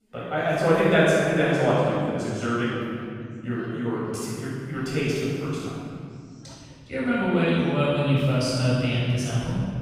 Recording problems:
room echo; strong; dies away in 2.4 s
off-mic speech; far
voice in the background; faint; throughout; 30 dB below the speech

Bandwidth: 15.5 kHz